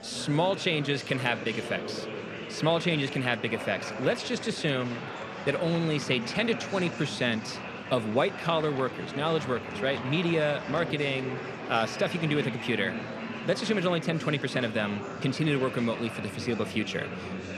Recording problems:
murmuring crowd; loud; throughout; 8 dB below the speech

